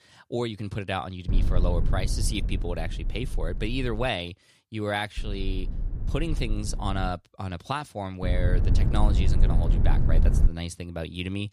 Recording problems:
low rumble; loud; from 1.5 to 4 s, from 5 to 7 s and from 8 to 10 s; 10 dB below the speech

